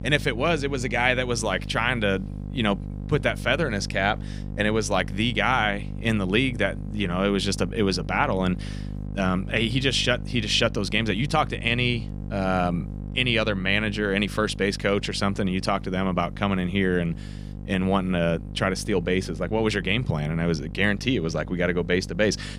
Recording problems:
electrical hum; faint; throughout; 50 Hz, 20 dB below the speech

